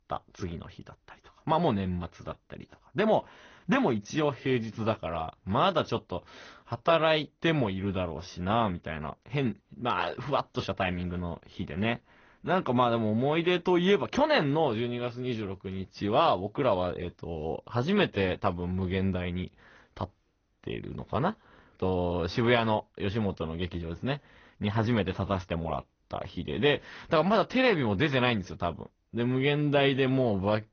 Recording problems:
garbled, watery; slightly; nothing above 6.5 kHz

